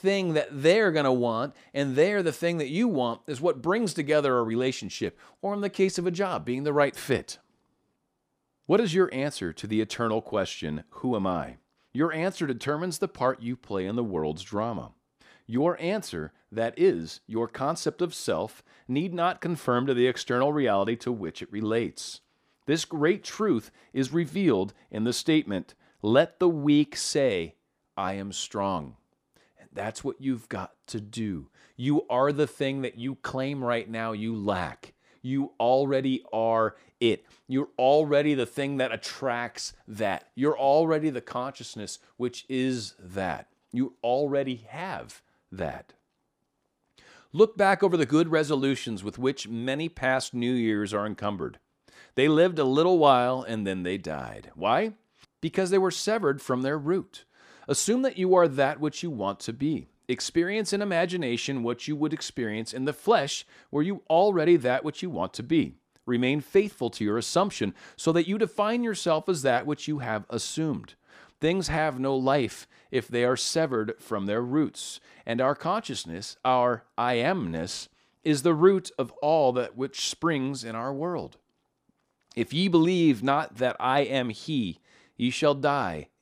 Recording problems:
none

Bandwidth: 15 kHz